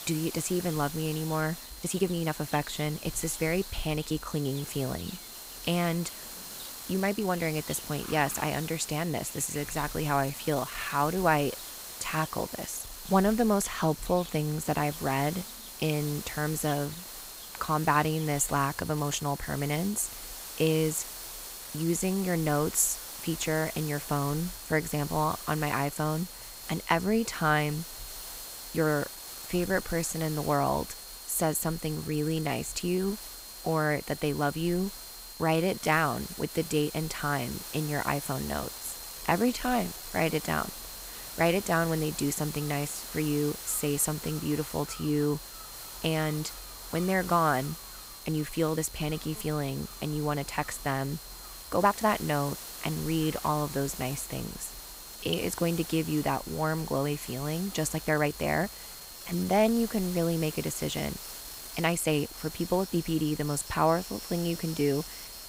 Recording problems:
high-pitched whine; noticeable; throughout; 4 kHz, 20 dB below the speech
hiss; noticeable; throughout; 10 dB below the speech
animal sounds; faint; throughout; 25 dB below the speech
uneven, jittery; strongly; from 1.5 s to 1:02

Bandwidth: 15.5 kHz